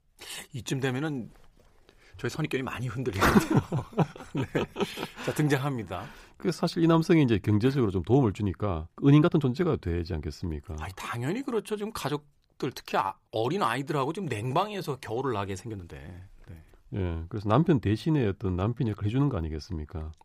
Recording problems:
uneven, jittery; strongly; from 0.5 to 19 s

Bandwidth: 15 kHz